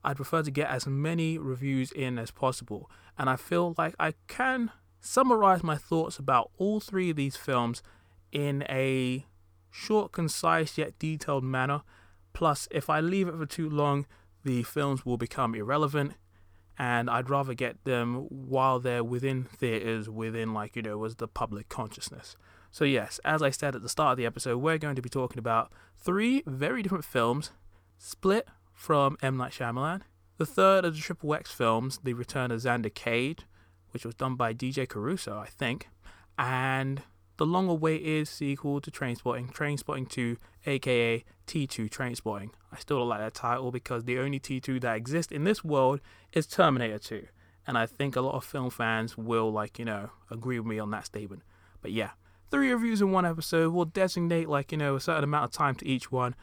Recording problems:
none

